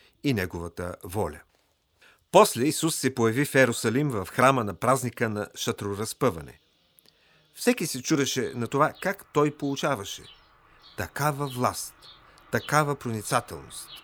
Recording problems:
animal sounds; faint; throughout; 25 dB below the speech

